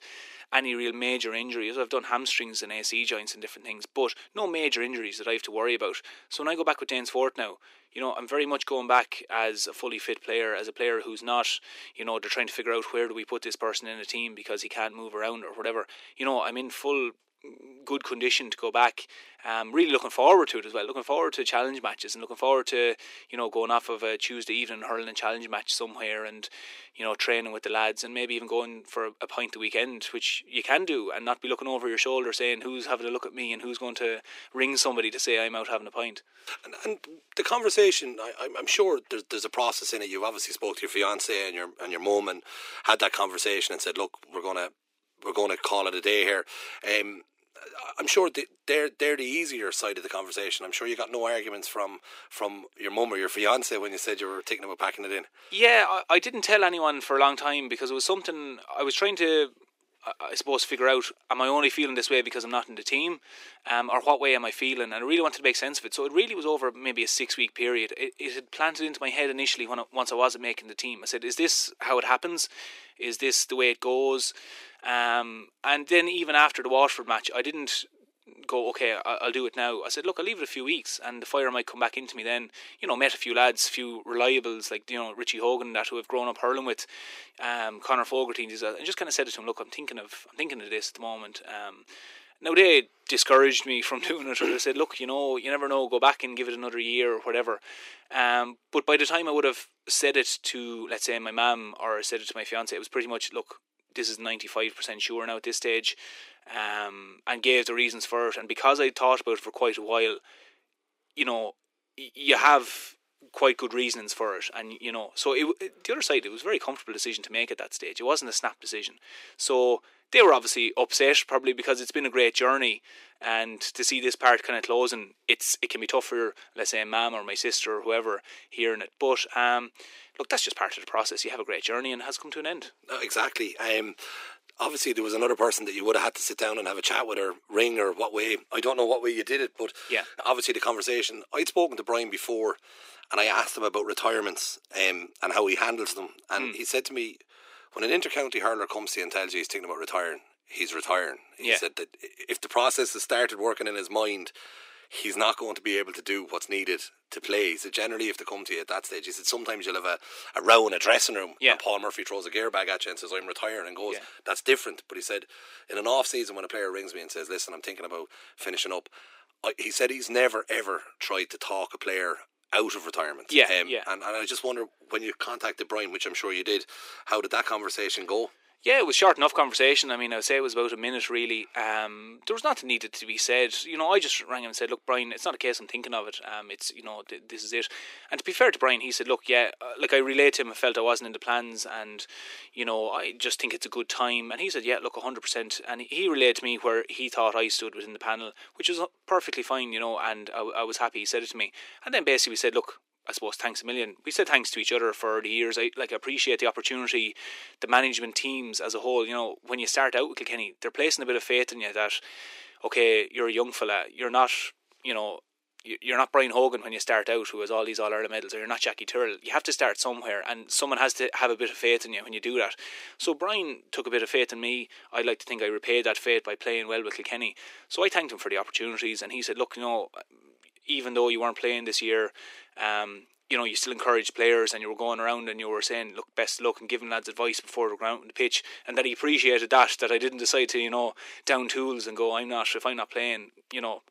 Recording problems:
thin; very; fading below 350 Hz

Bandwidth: 15.5 kHz